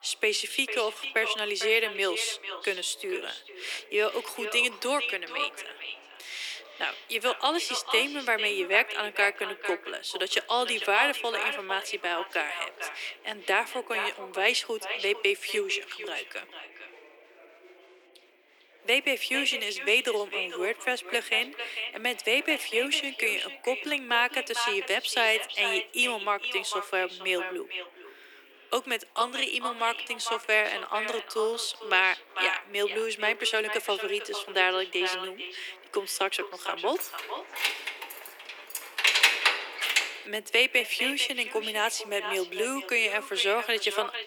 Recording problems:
echo of what is said; strong; throughout; 450 ms later, 8 dB below the speech
thin; very; fading below 350 Hz
chatter from many people; faint; throughout; 25 dB below the speech
jangling keys; loud; from 37 to 40 s; peak 8 dB above the speech

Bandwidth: 18.5 kHz